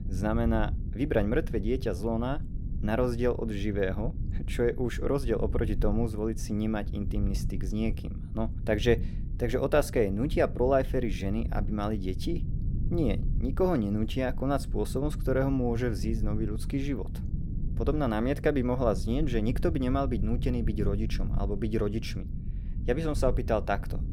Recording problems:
low rumble; noticeable; throughout; 15 dB below the speech

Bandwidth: 16 kHz